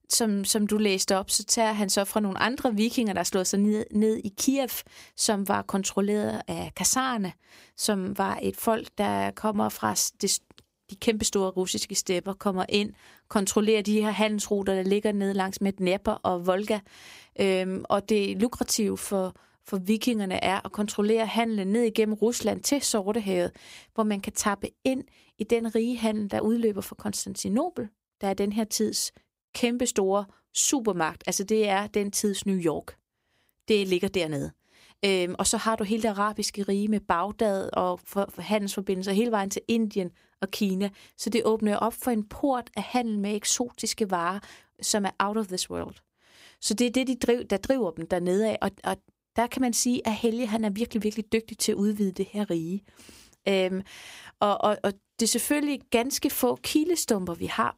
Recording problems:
none

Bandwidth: 15.5 kHz